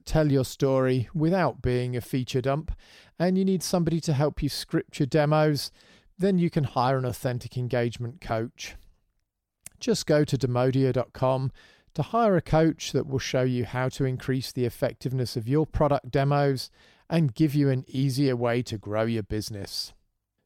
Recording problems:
none

